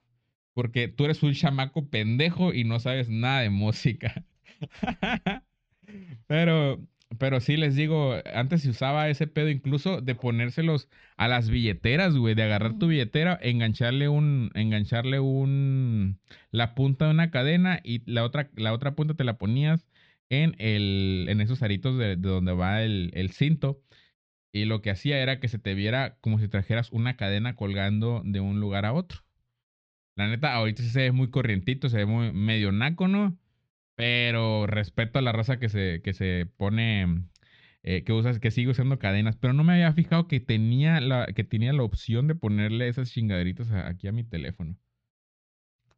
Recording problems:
muffled; very slightly; fading above 4.5 kHz

